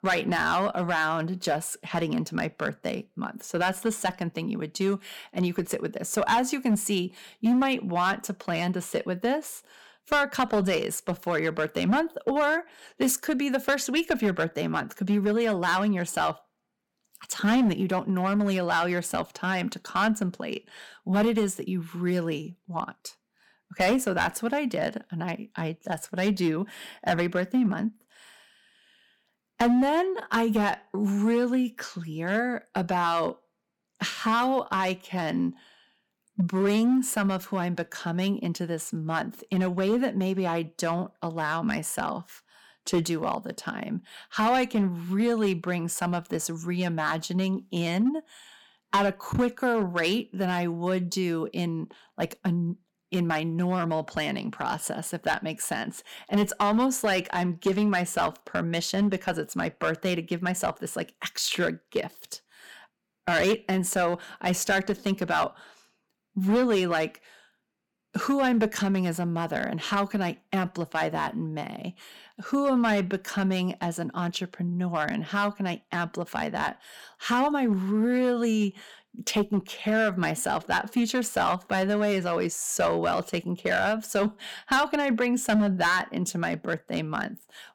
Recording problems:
distortion; slight; 4% of the sound clipped

